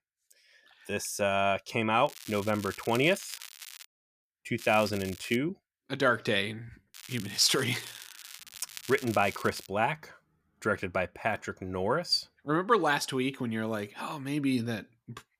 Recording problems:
crackling; noticeable; from 2 to 4 s, at 4.5 s and from 7 to 9.5 s; 15 dB below the speech

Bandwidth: 15 kHz